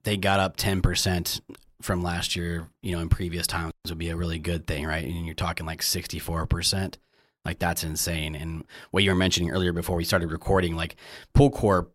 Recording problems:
none

